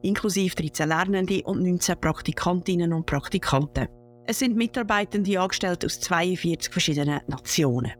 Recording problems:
electrical hum; faint; throughout; 60 Hz, 30 dB below the speech

